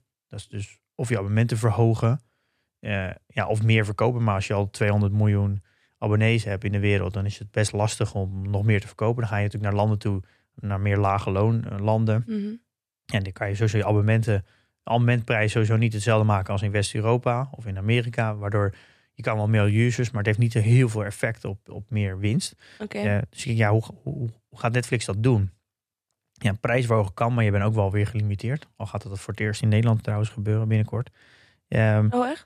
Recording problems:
none

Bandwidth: 14 kHz